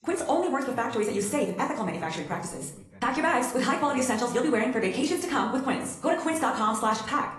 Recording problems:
wrong speed, natural pitch; too fast; 1.5 times normal speed
room echo; slight; dies away in 0.5 s
off-mic speech; somewhat distant
garbled, watery; slightly; nothing above 11.5 kHz
voice in the background; faint; throughout; 25 dB below the speech

